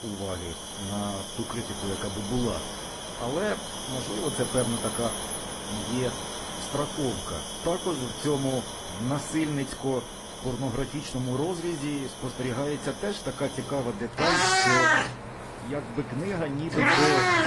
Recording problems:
garbled, watery; slightly; nothing above 10.5 kHz
animal sounds; very loud; throughout; 3 dB above the speech
wind noise on the microphone; heavy; 7 dB below the speech

